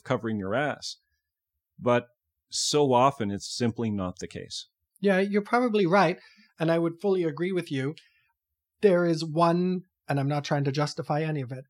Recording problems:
none

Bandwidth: 17 kHz